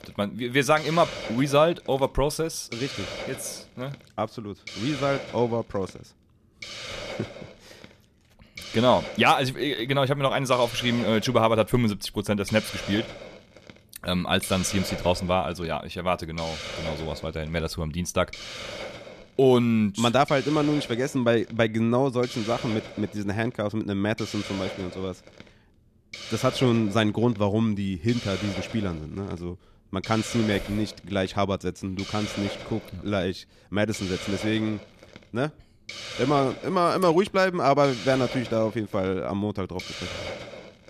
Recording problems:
hiss; noticeable; throughout; 10 dB below the speech

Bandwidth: 14.5 kHz